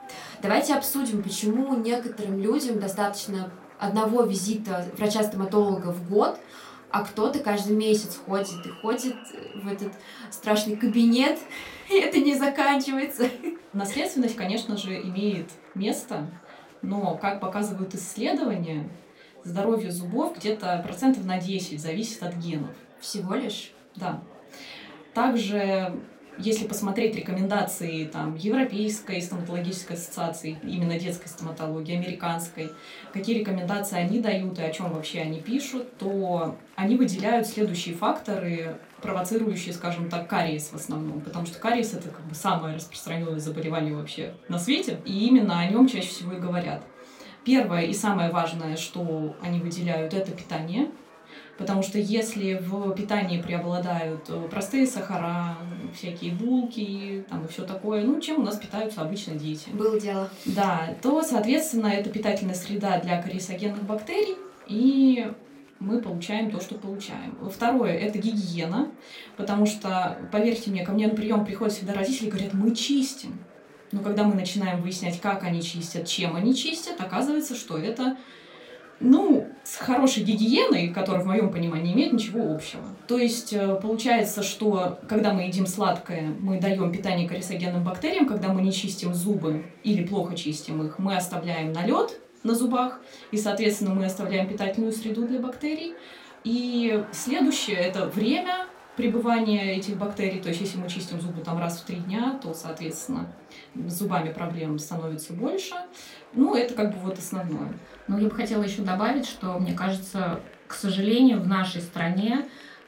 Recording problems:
room echo; very slight; dies away in 0.2 s
off-mic speech; somewhat distant
chatter from many people; faint; throughout; 25 dB below the speech

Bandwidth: 16 kHz